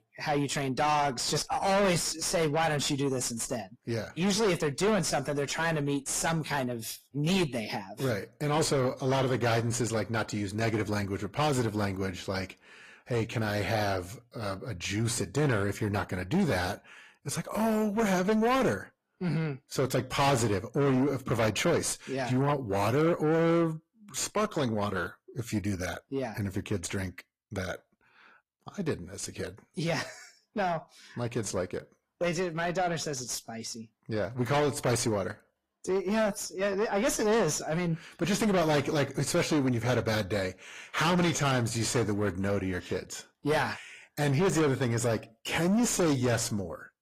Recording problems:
distortion; heavy; 6 dB below the speech
garbled, watery; slightly

